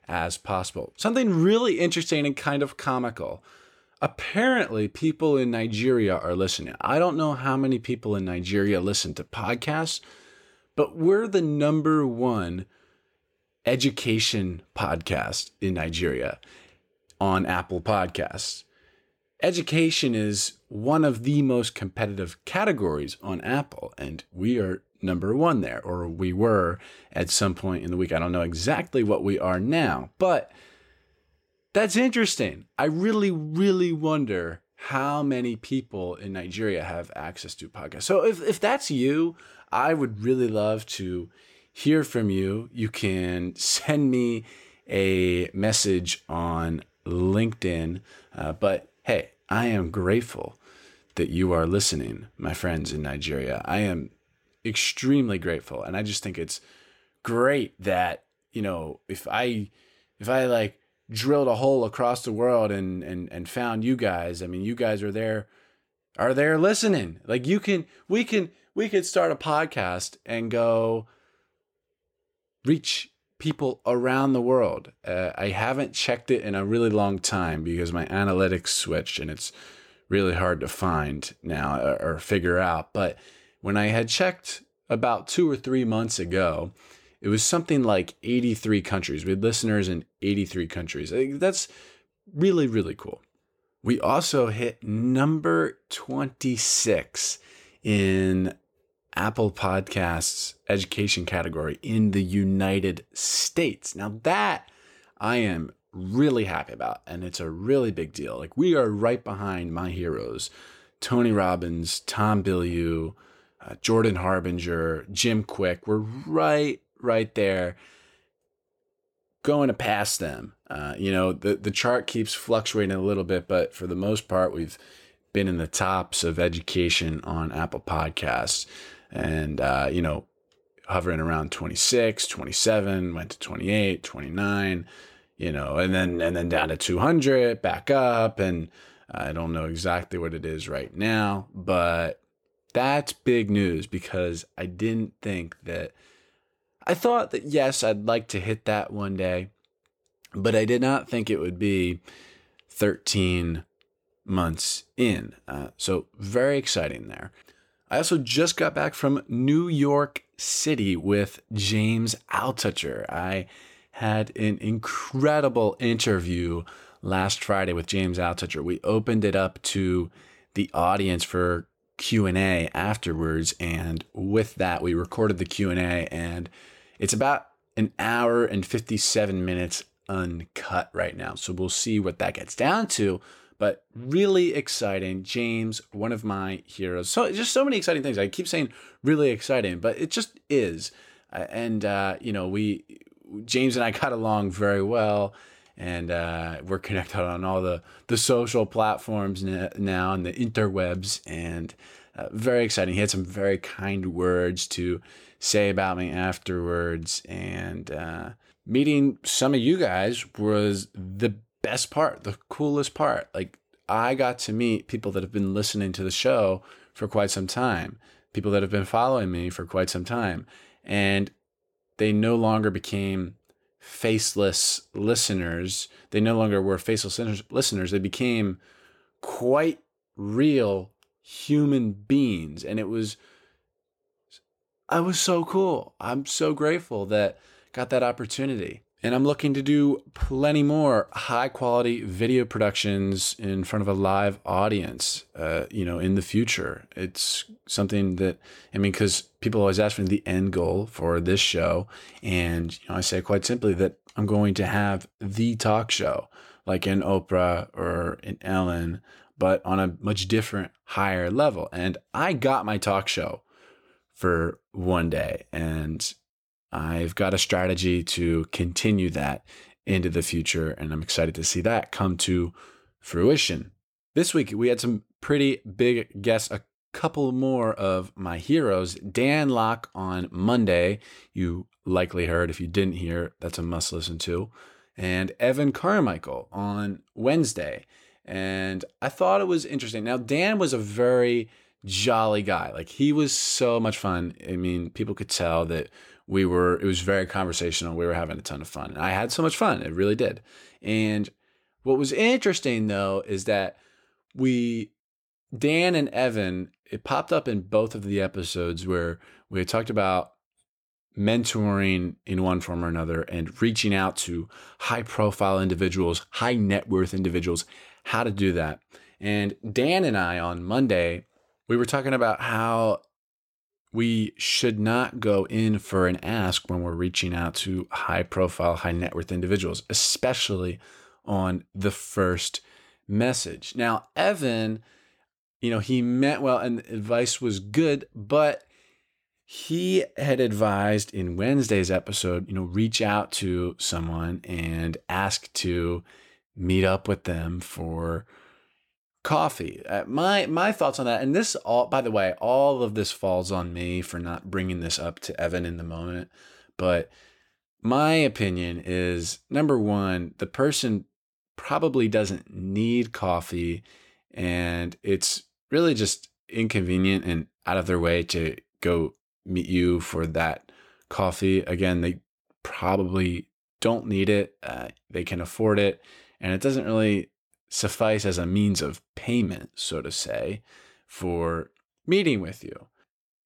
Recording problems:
none

